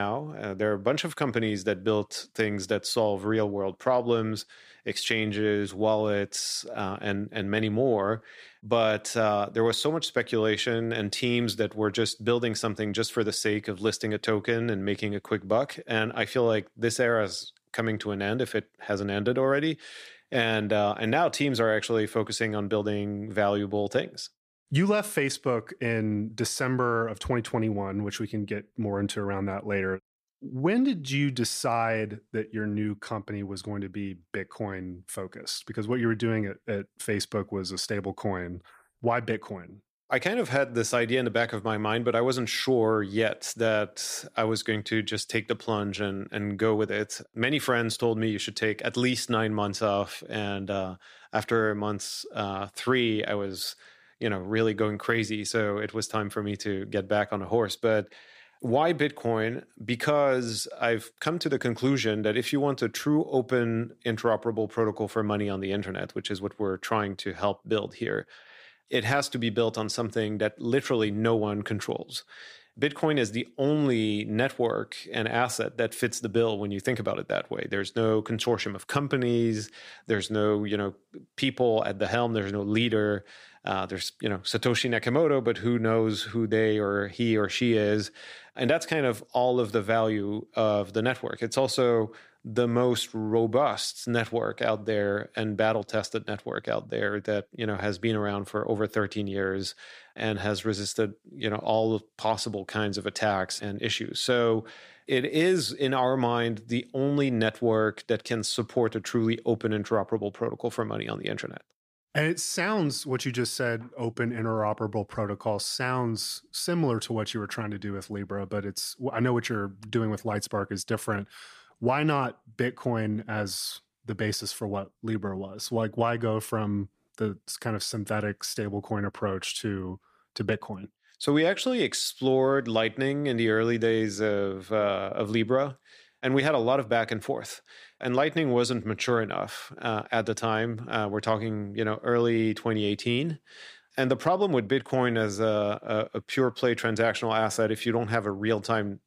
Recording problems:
abrupt cut into speech; at the start

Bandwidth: 15 kHz